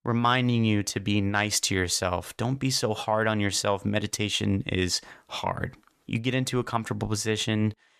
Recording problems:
none

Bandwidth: 14.5 kHz